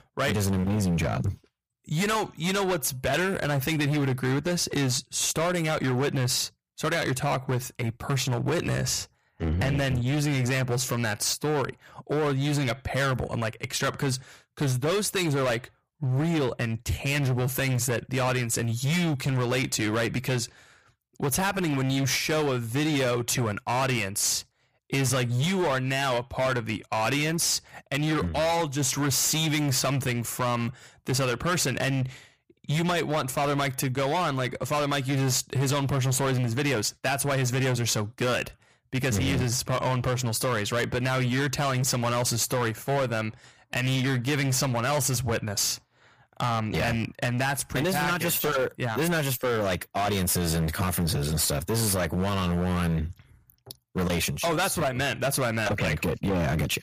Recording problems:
distortion; heavy; 21% of the sound clipped

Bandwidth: 15 kHz